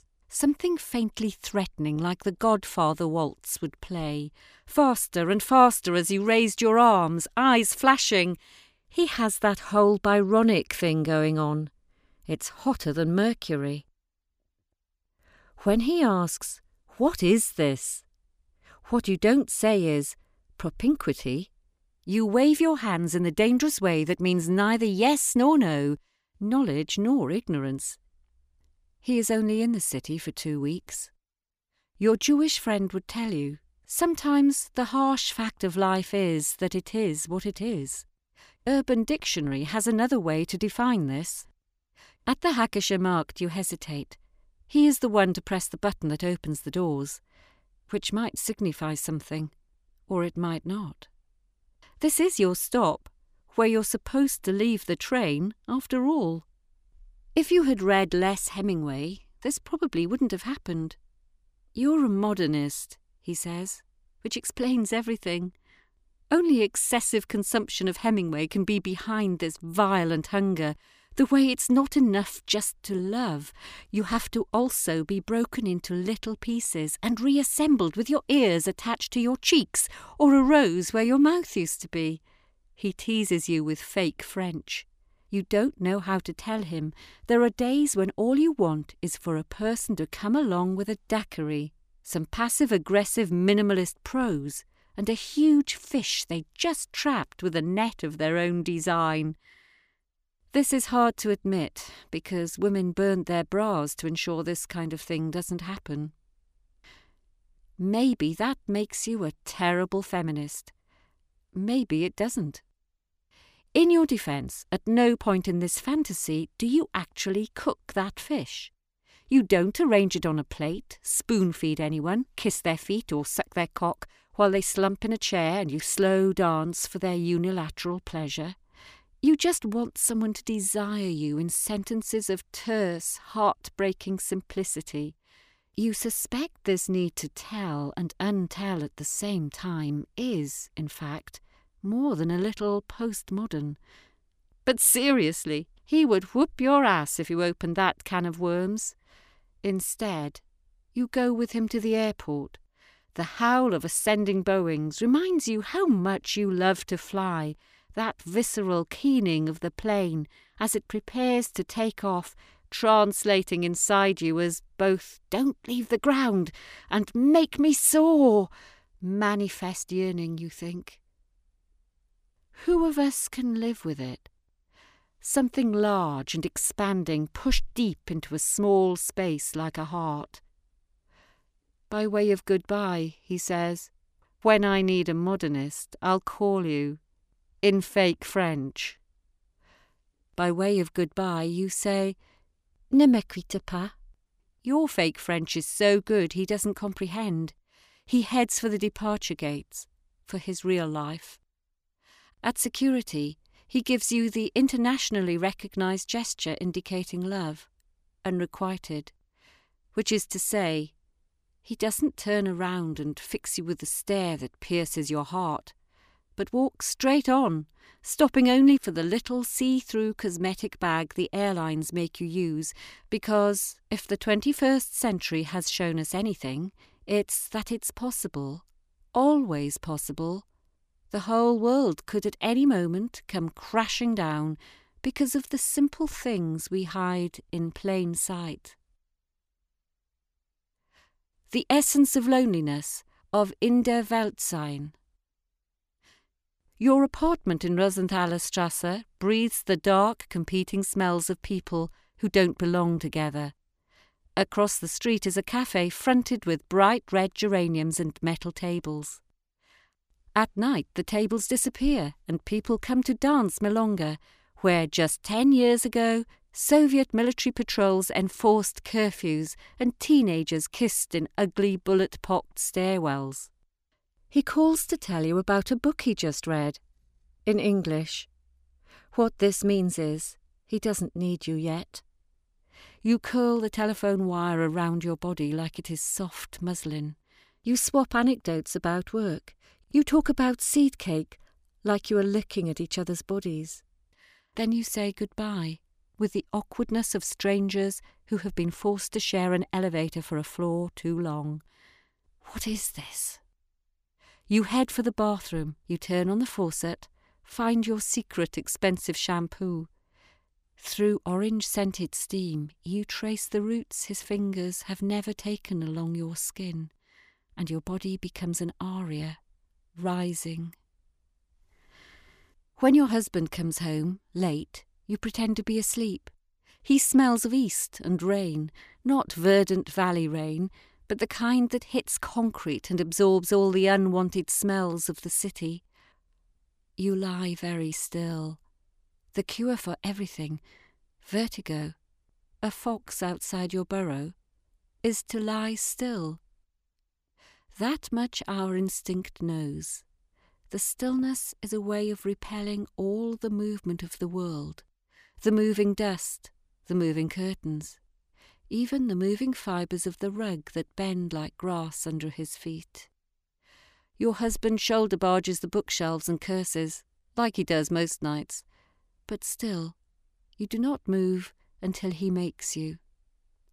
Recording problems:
none

